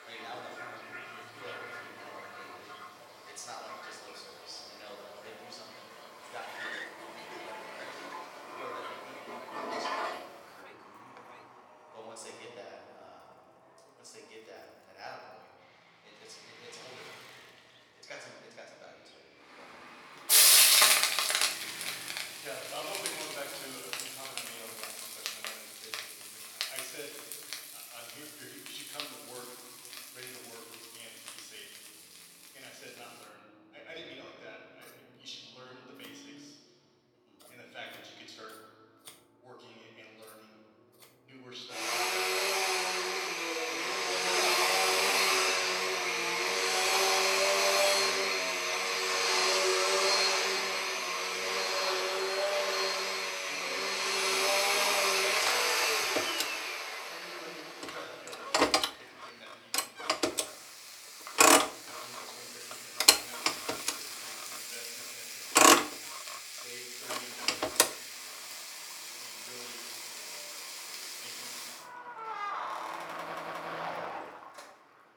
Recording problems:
off-mic speech; far
room echo; noticeable; dies away in 1.8 s
thin; somewhat; fading below 450 Hz
household noises; very loud; throughout; 20 dB above the speech
traffic noise; very loud; throughout; 20 dB above the speech
audio stuttering; at 1:13

